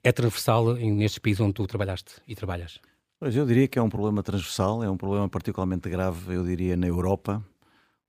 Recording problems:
none

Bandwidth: 15 kHz